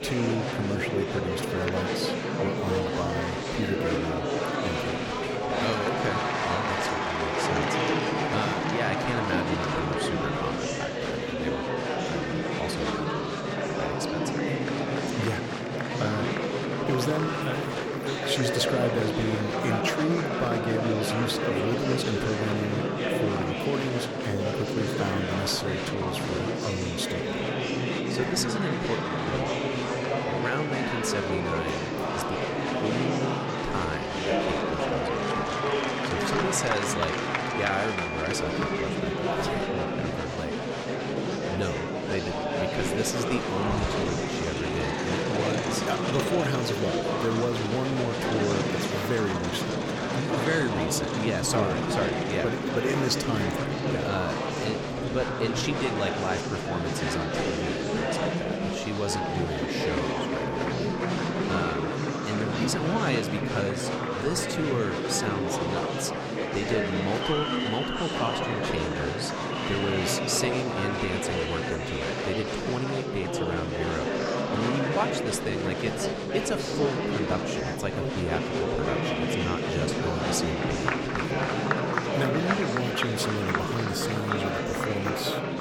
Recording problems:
murmuring crowd; very loud; throughout; 3 dB above the speech
animal sounds; very faint; throughout; 20 dB below the speech

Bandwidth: 17.5 kHz